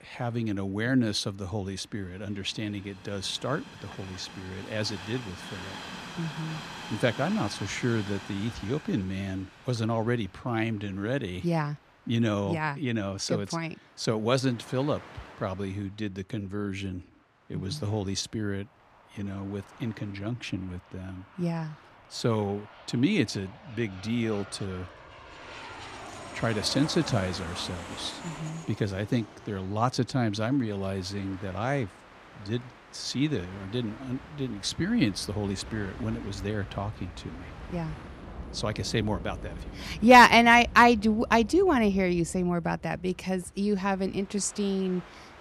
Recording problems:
train or aircraft noise; noticeable; throughout; 15 dB below the speech

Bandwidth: 15 kHz